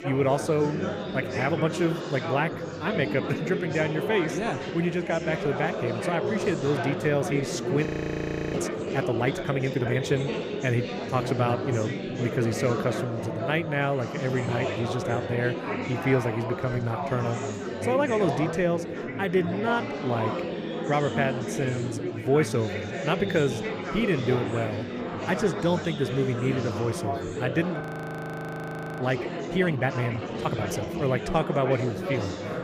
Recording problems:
chatter from many people; loud; throughout; 3 dB below the speech
audio freezing; at 8 s for 0.5 s and at 28 s for 1 s

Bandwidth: 15.5 kHz